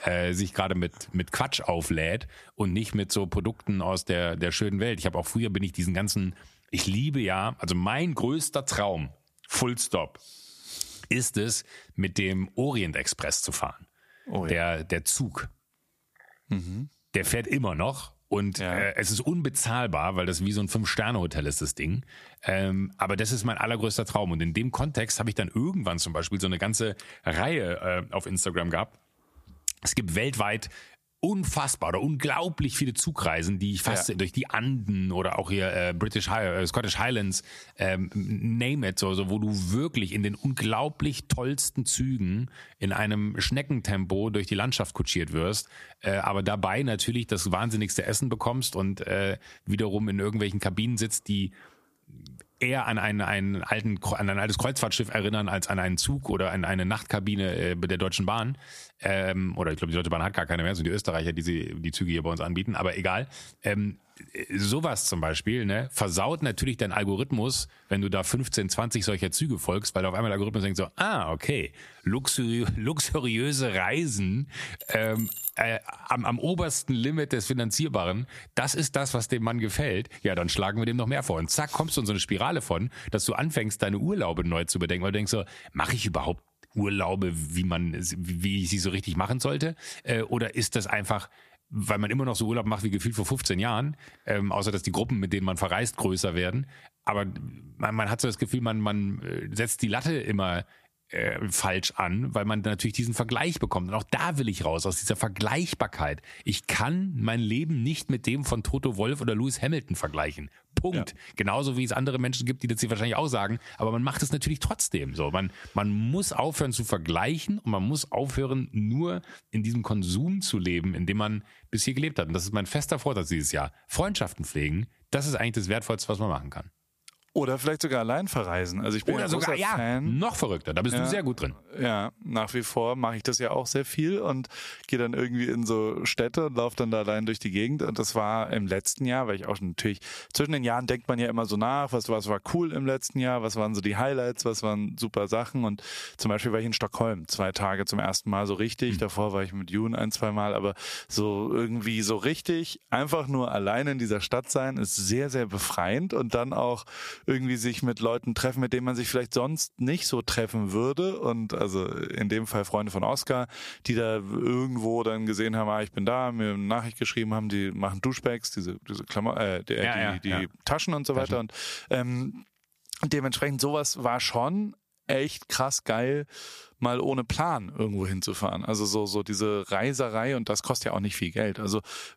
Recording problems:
squashed, flat; somewhat
jangling keys; noticeable; at 1:15; peak 3 dB below the speech

